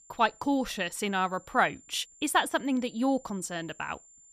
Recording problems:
high-pitched whine; faint; throughout; 7.5 kHz, 25 dB below the speech

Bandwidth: 14.5 kHz